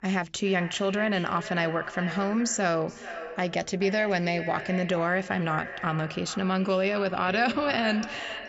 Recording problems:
echo of what is said; strong; throughout; 420 ms later, 10 dB below the speech
high frequencies cut off; noticeable; nothing above 8 kHz

